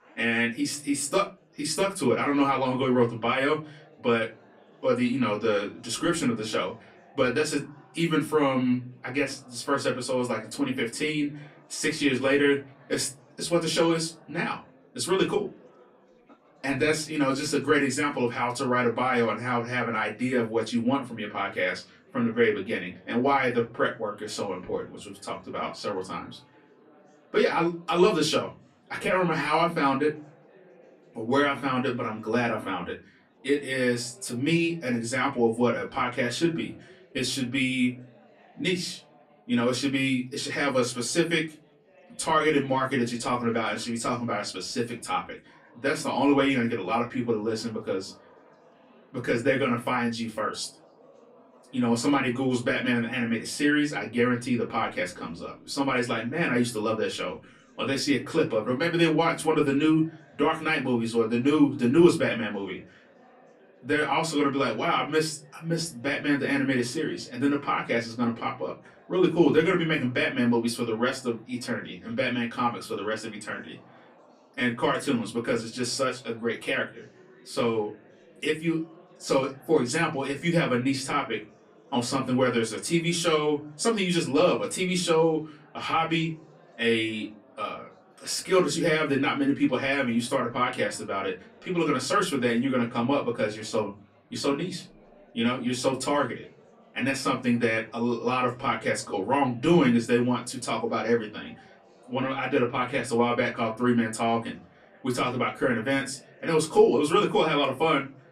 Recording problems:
off-mic speech; far
room echo; very slight; dies away in 0.3 s
chatter from many people; faint; throughout; 30 dB below the speech

